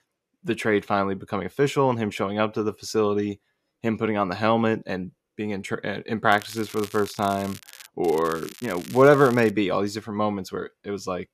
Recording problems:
crackling; noticeable; from 6.5 to 8 s and from 8 to 9.5 s; 20 dB below the speech

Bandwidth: 14.5 kHz